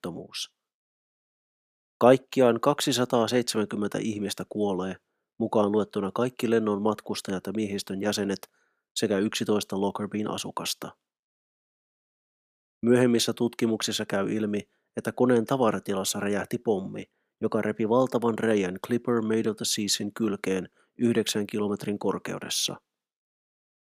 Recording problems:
none

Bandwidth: 15 kHz